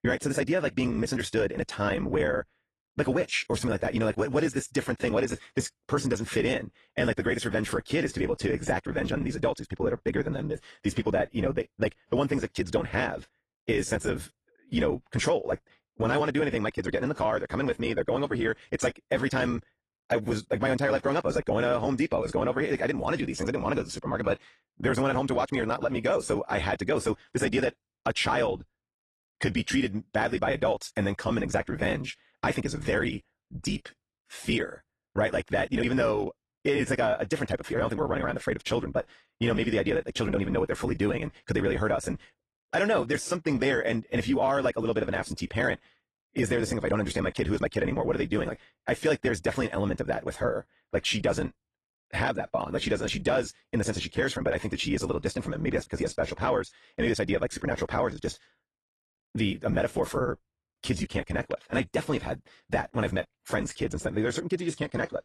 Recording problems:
wrong speed, natural pitch; too fast; 1.5 times normal speed
garbled, watery; slightly

